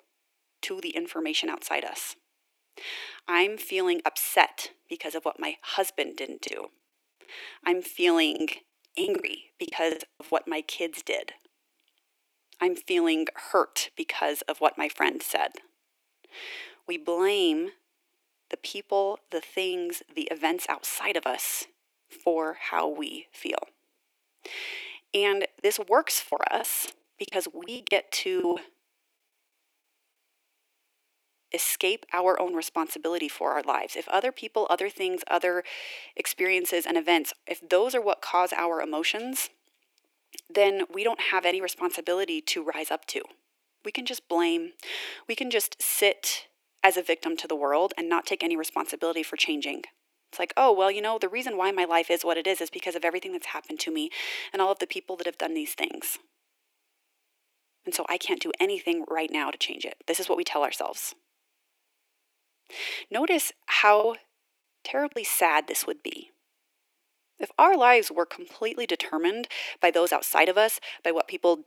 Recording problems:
thin; very; fading below 350 Hz
choppy; very; from 6.5 to 10 s, from 26 to 29 s and from 1:04 to 1:05; 16% of the speech affected

